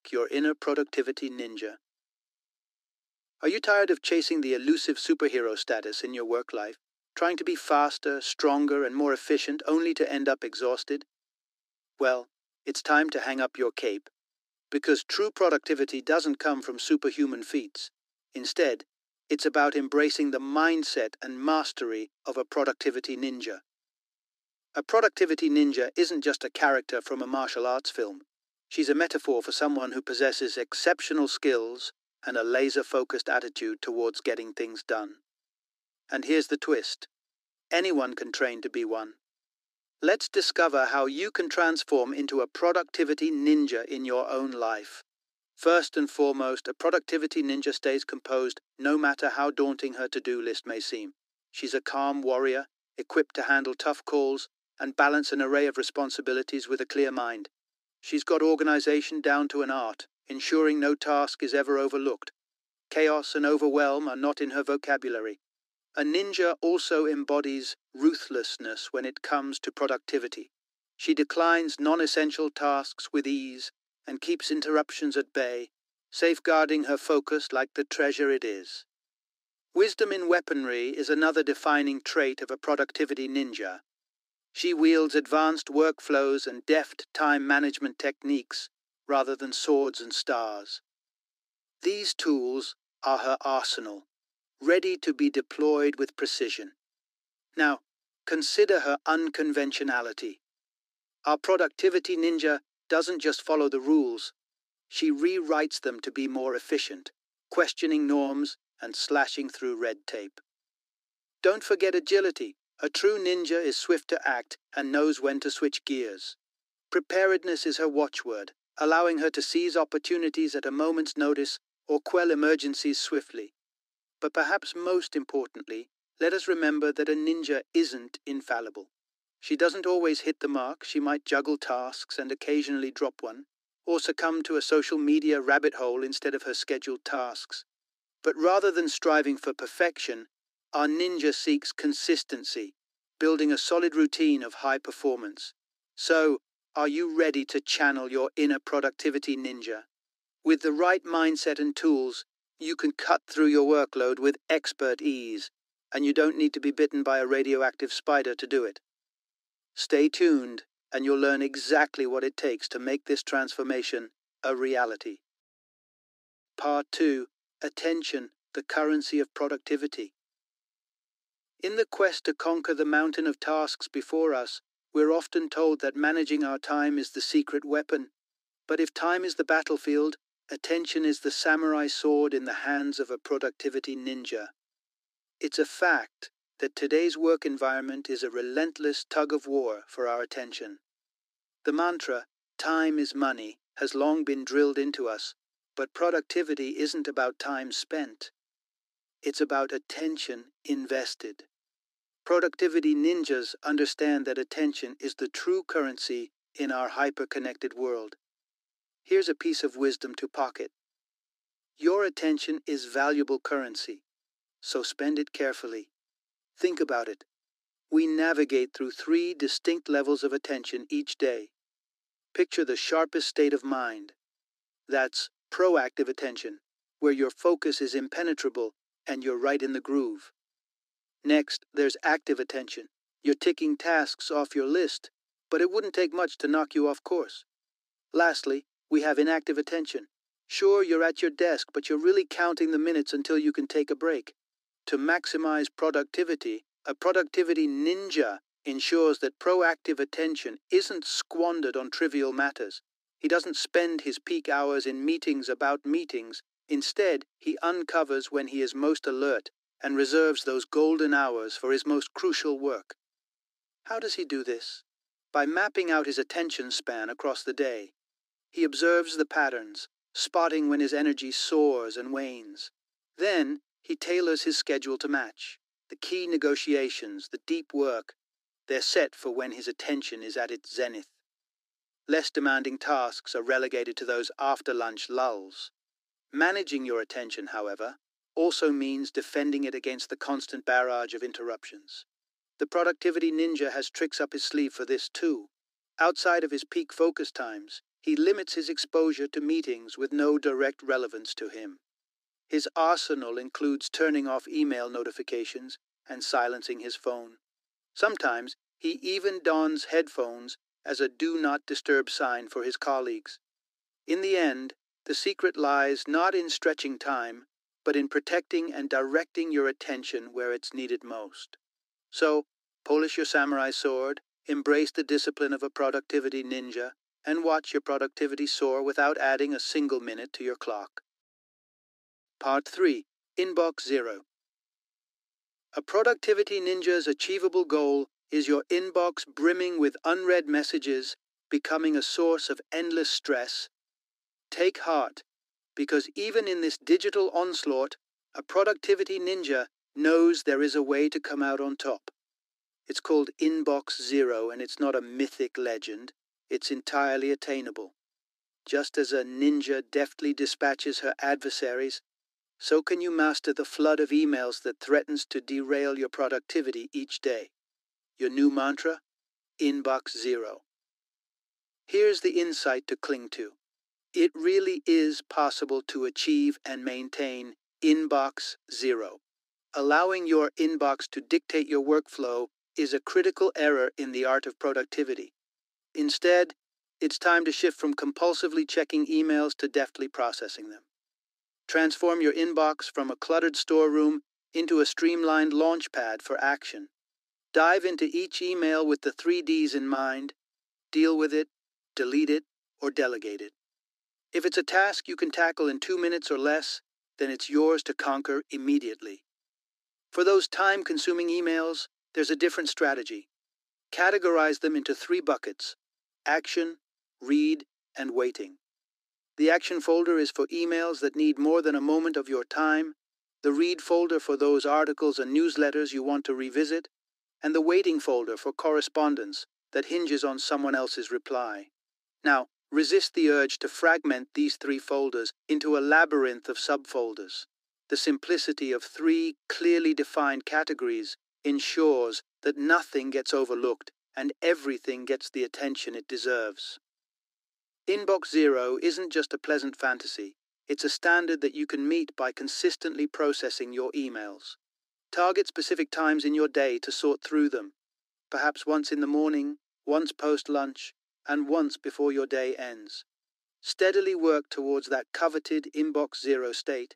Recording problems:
thin; somewhat; fading below 300 Hz

